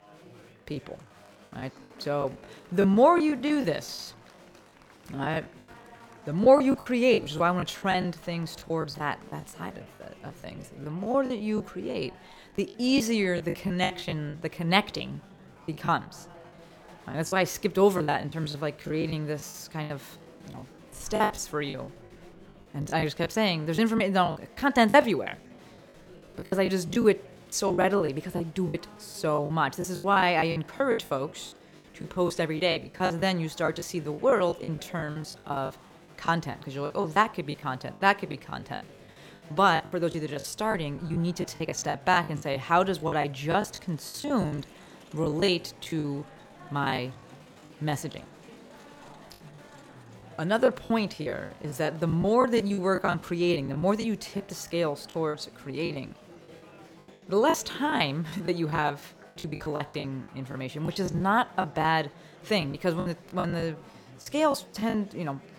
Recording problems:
murmuring crowd; faint; throughout; 25 dB below the speech
choppy; very; 16% of the speech affected

